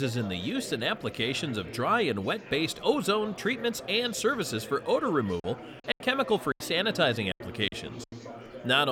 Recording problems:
chatter from many people; noticeable; throughout; 15 dB below the speech
abrupt cut into speech; at the start and the end
choppy; very; from 5.5 to 7.5 s; 12% of the speech affected

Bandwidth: 17 kHz